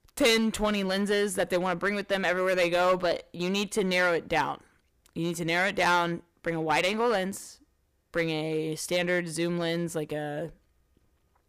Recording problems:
distortion; slight; 6% of the sound clipped

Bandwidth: 15 kHz